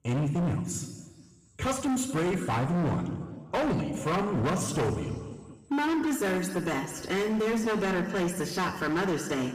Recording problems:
distortion; heavy; 24% of the sound clipped
room echo; slight; dies away in 1.7 s
off-mic speech; somewhat distant

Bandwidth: 15 kHz